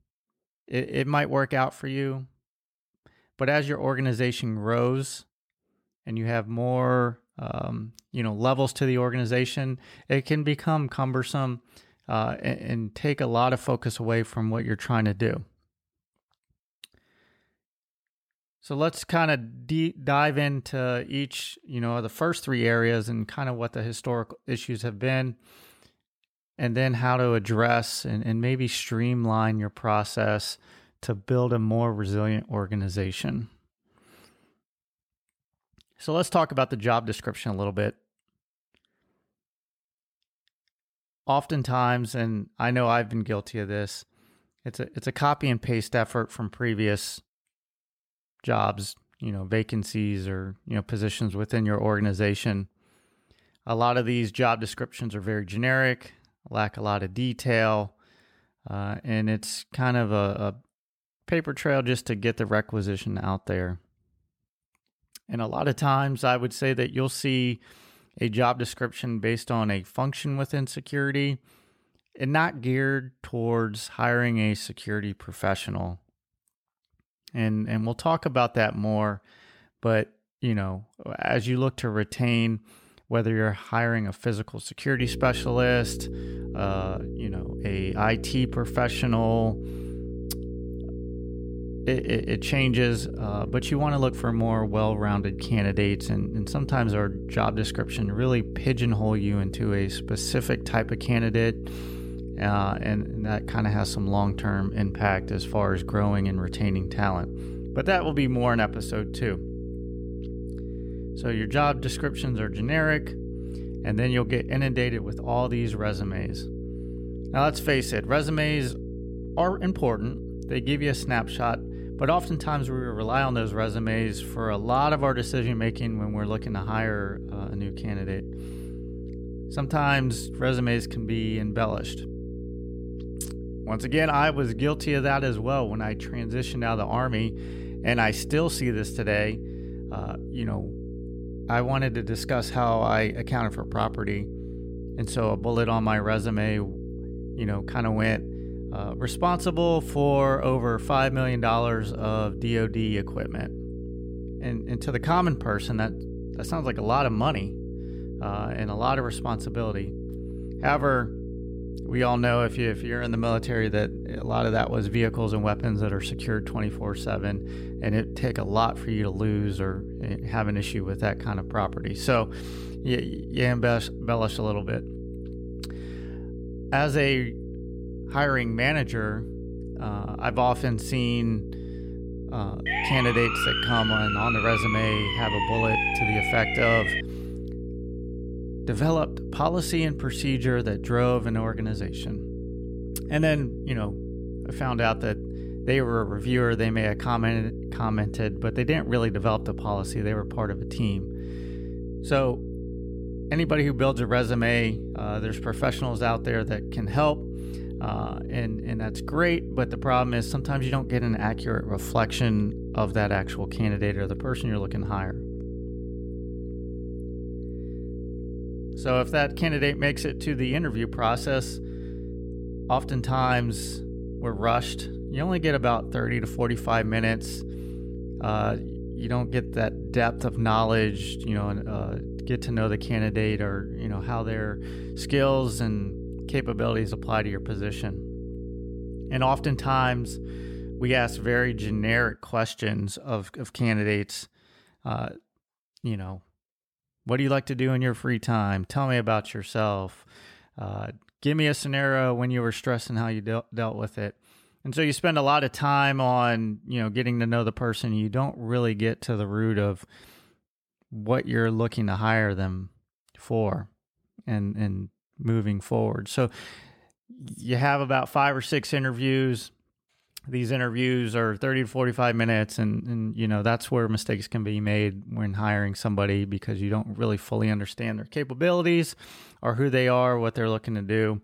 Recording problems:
electrical hum; noticeable; from 1:25 to 4:02; 60 Hz, 15 dB below the speech
siren; loud; from 3:03 to 3:07; peak 3 dB above the speech

